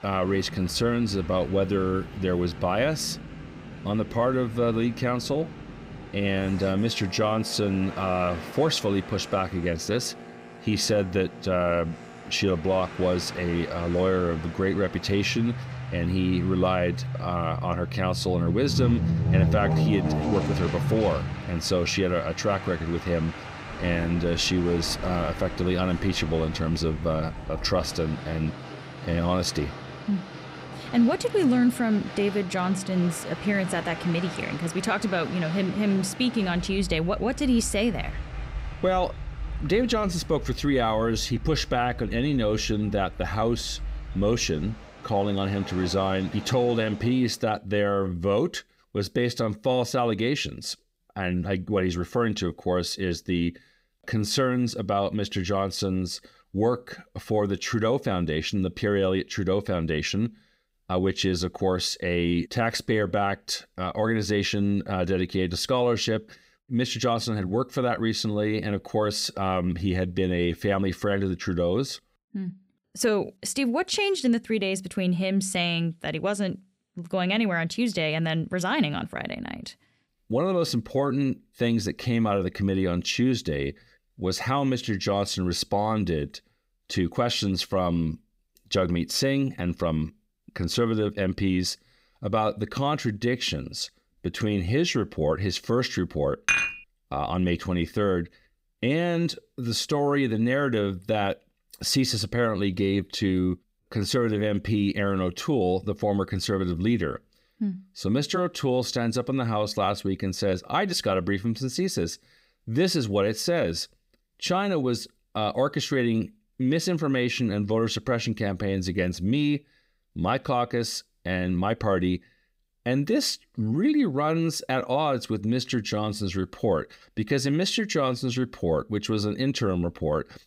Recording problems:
train or aircraft noise; loud; until 47 s; 9 dB below the speech
clattering dishes; loud; at 1:36; peak 4 dB above the speech

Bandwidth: 15.5 kHz